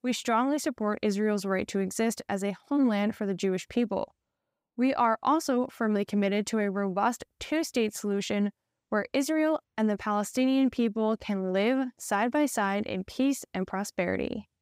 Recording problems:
none

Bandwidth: 15.5 kHz